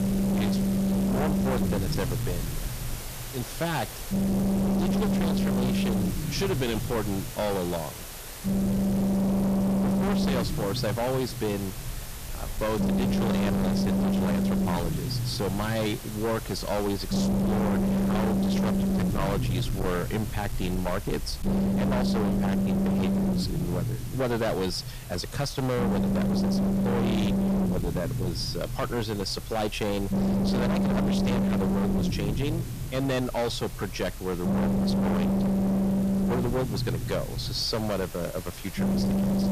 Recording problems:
distortion; heavy; 34% of the sound clipped
low rumble; loud; throughout; 1 dB below the speech
hiss; noticeable; throughout; 10 dB below the speech

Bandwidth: 14.5 kHz